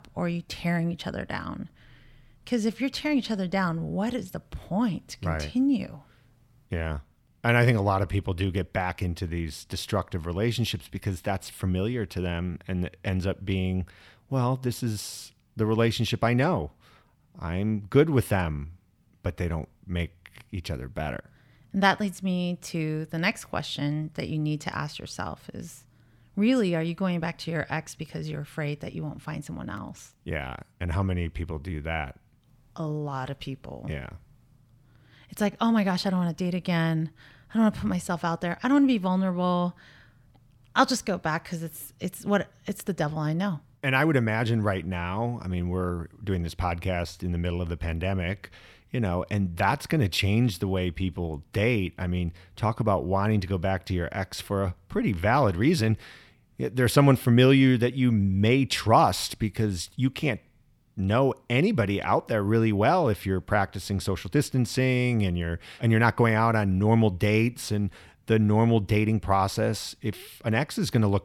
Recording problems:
none

